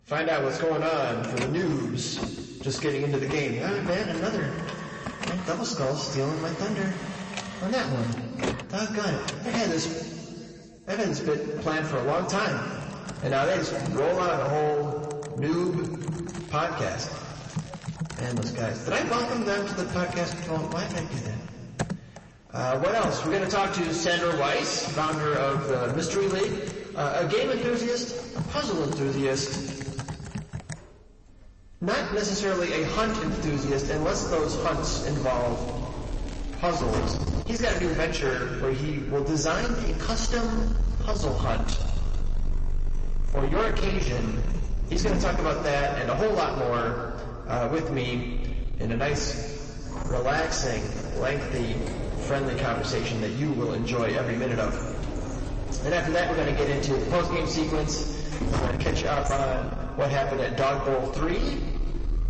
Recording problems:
room echo; noticeable; dies away in 2.3 s
distortion; slight; 10 dB below the speech
off-mic speech; somewhat distant
garbled, watery; slightly; nothing above 7.5 kHz
household noises; loud; throughout; 8 dB below the speech
crackling; faint; from 16 to 18 s and from 35 to 37 s; 20 dB below the speech

